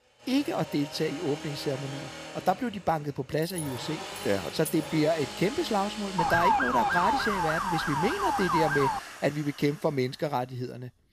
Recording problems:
machinery noise; loud; throughout; 10 dB below the speech
jangling keys; noticeable; from 3.5 to 5 s; peak 9 dB below the speech
siren; loud; from 6 to 9 s; peak 6 dB above the speech

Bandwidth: 14.5 kHz